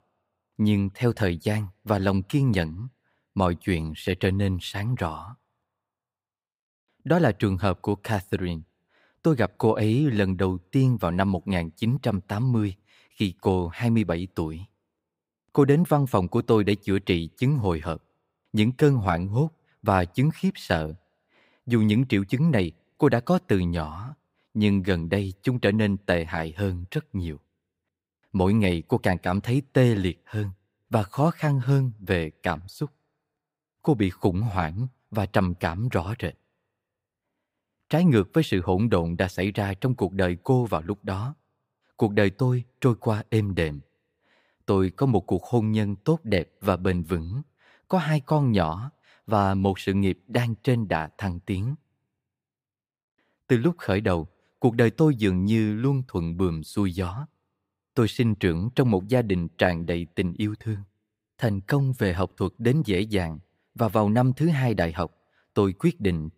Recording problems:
none

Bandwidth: 15.5 kHz